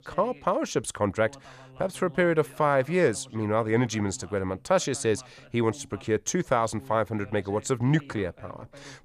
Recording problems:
voice in the background; faint; throughout; 25 dB below the speech

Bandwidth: 14.5 kHz